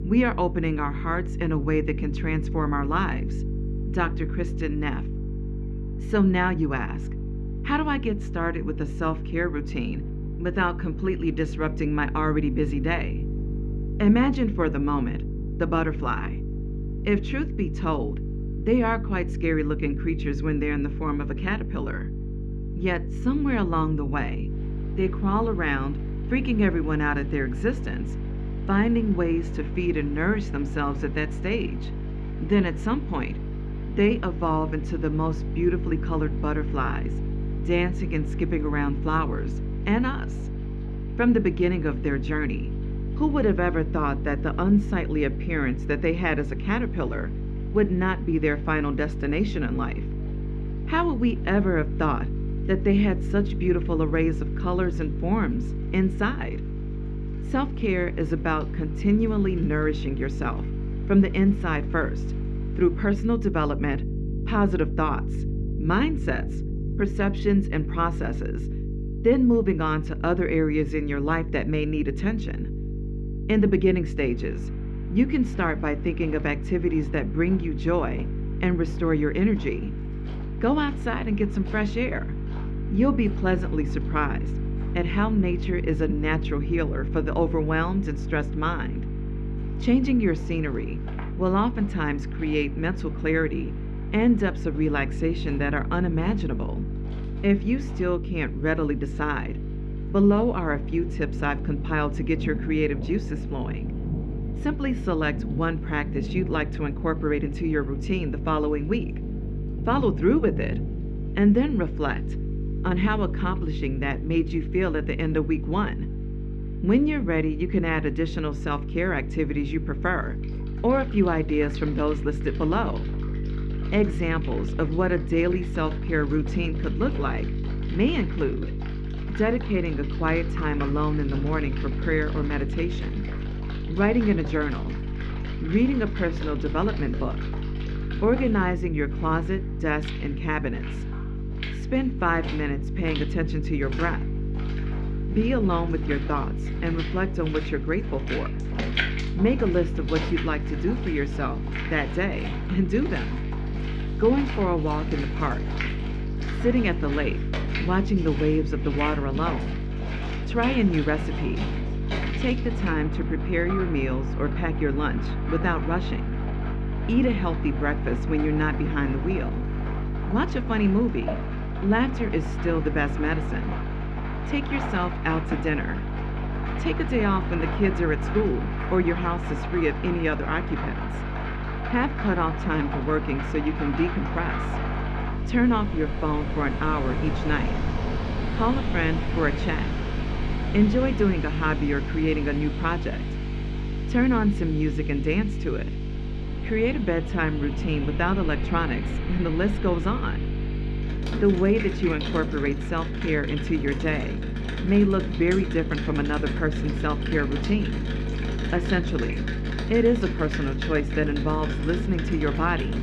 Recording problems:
muffled; very; fading above 3 kHz
electrical hum; noticeable; throughout; 50 Hz, 15 dB below the speech
rain or running water; noticeable; throughout; 10 dB below the speech

